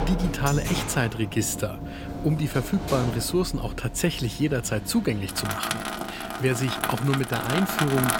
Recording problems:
household noises; loud; throughout; 6 dB below the speech

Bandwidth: 16.5 kHz